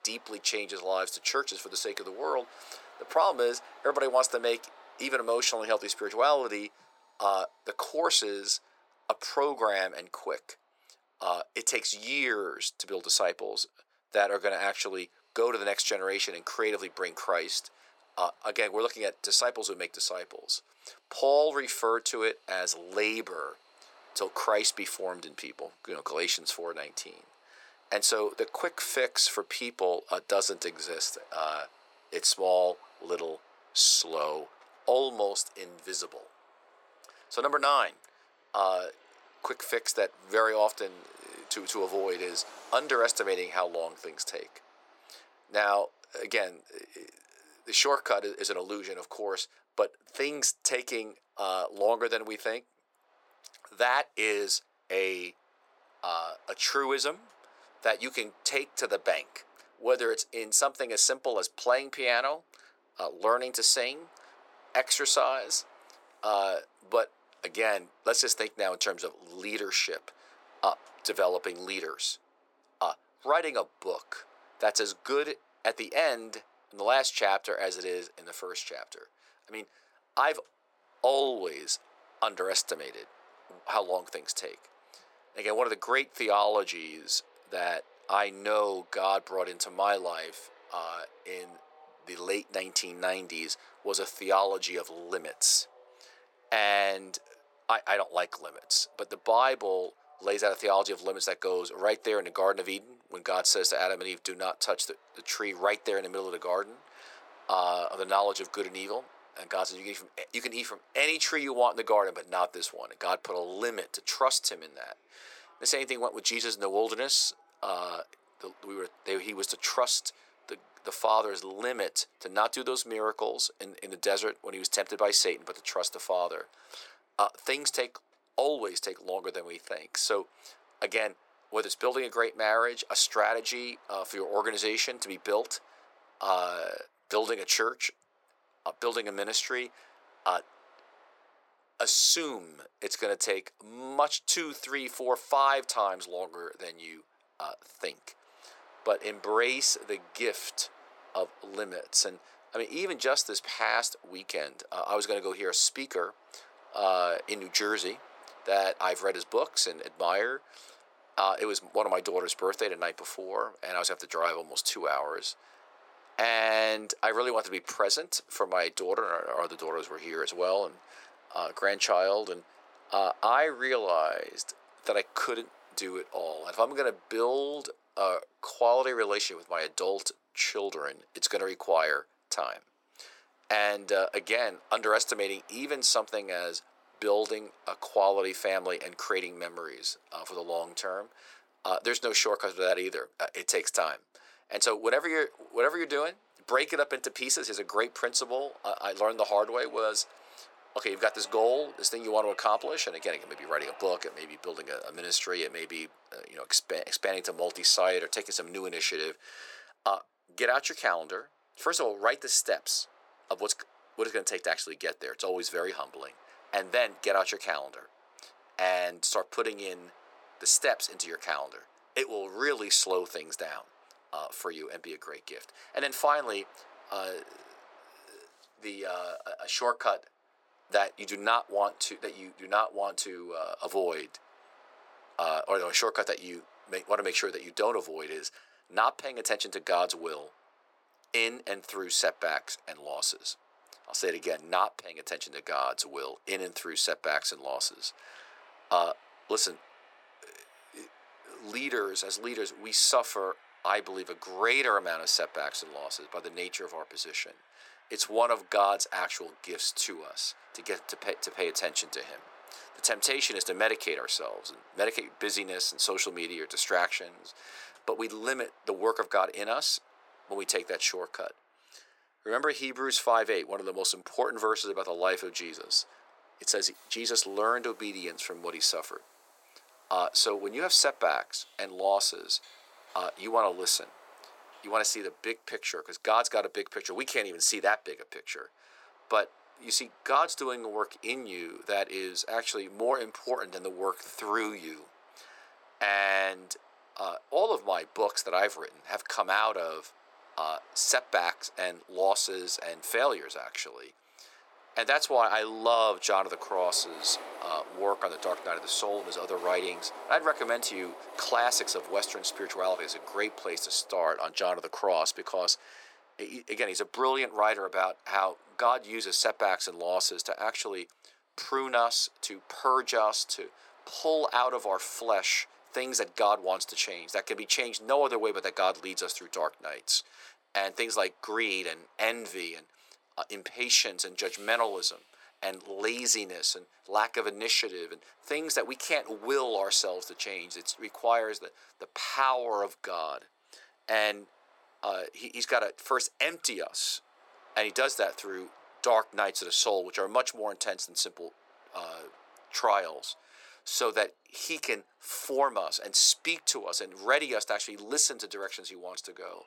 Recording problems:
thin; very; fading below 450 Hz
train or aircraft noise; faint; throughout; 25 dB below the speech

